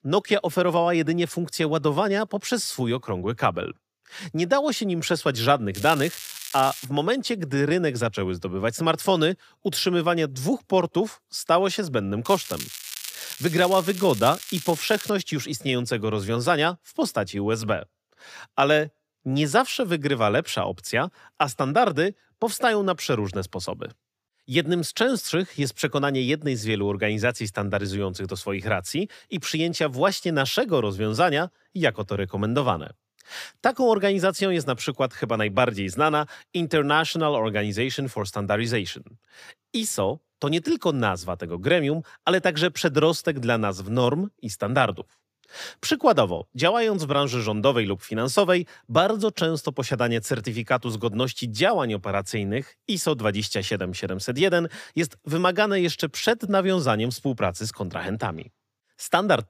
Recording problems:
crackling; noticeable; from 6 to 7 s and from 12 to 15 s; 10 dB below the speech

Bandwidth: 15 kHz